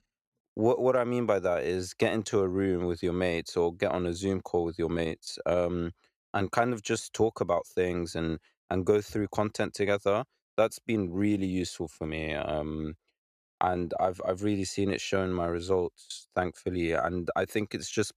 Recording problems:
none

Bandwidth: 14.5 kHz